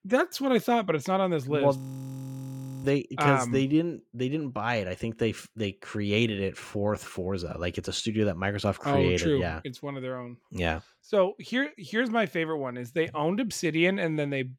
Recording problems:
audio freezing; at 2 s for 1 s

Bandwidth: 18 kHz